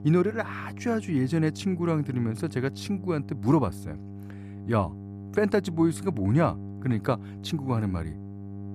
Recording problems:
electrical hum; noticeable; throughout; 50 Hz, 15 dB below the speech

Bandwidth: 14.5 kHz